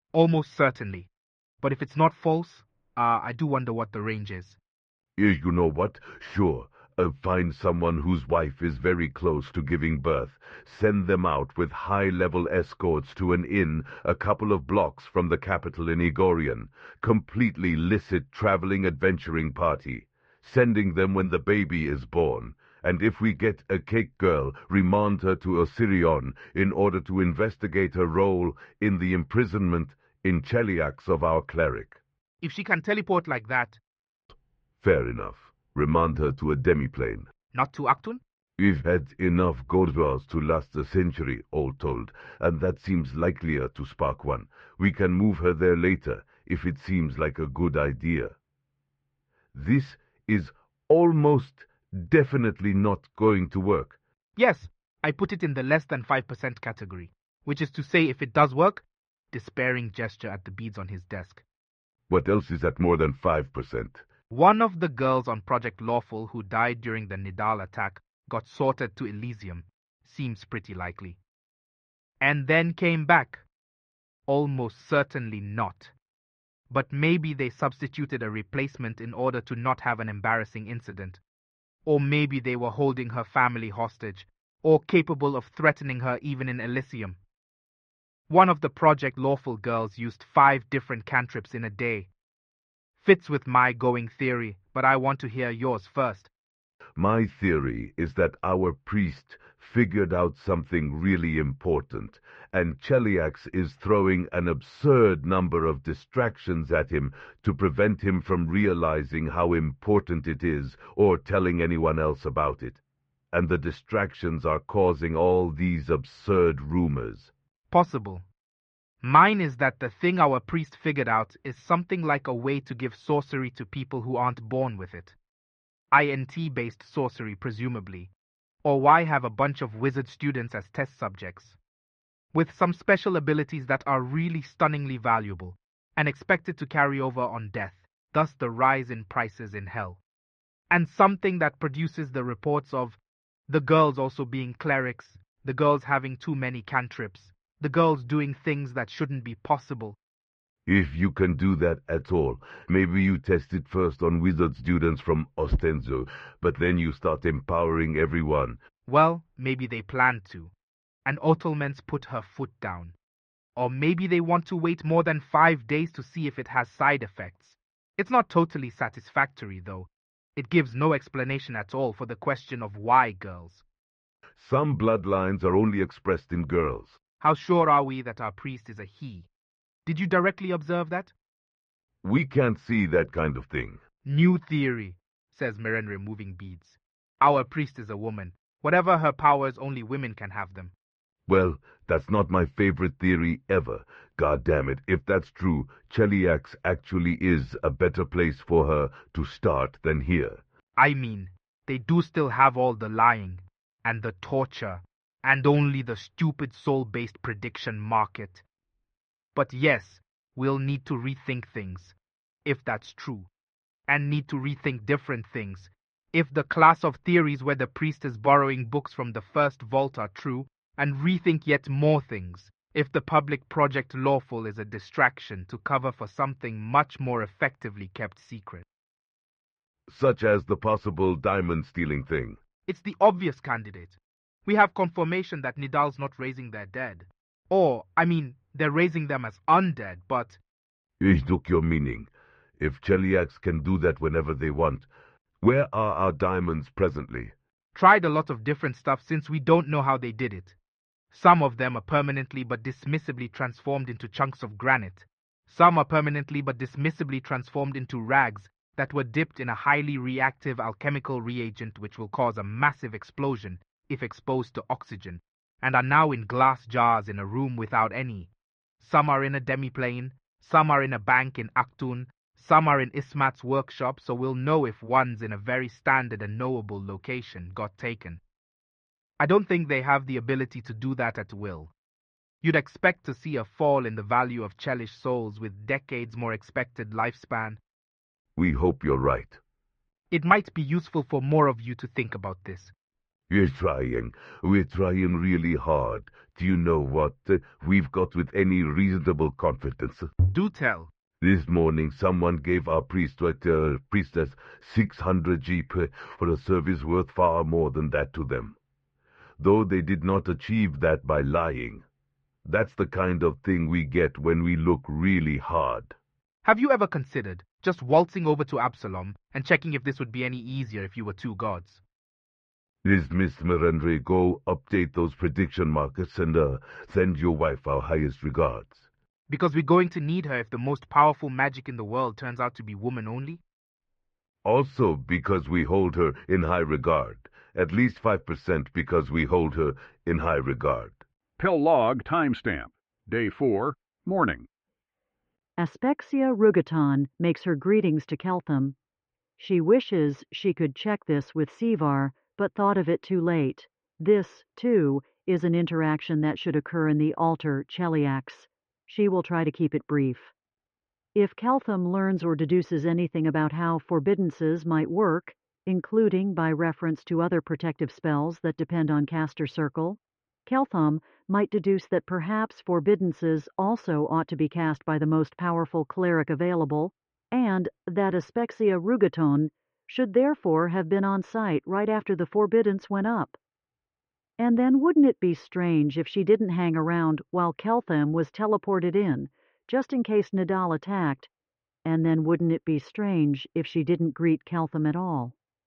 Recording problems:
muffled; very; fading above 2.5 kHz

